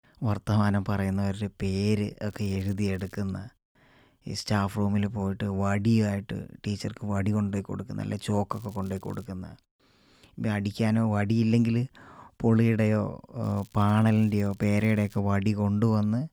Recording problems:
crackling; faint; at 2.5 s, at 8.5 s and from 13 to 15 s; 30 dB below the speech

